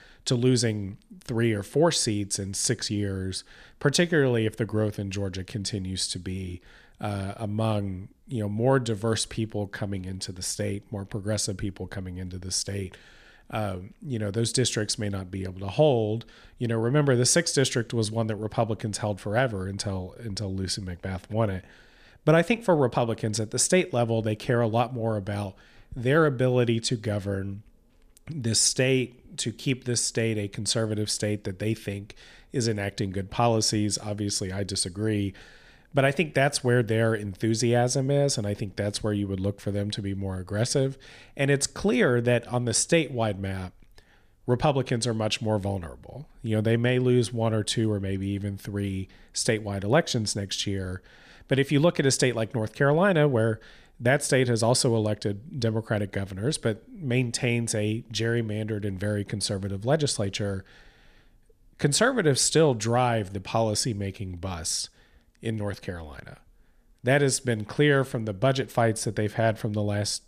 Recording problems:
none

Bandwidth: 14.5 kHz